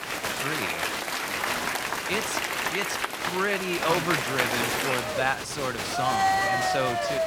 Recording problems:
crowd noise; very loud; throughout; 3 dB above the speech

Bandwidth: 17 kHz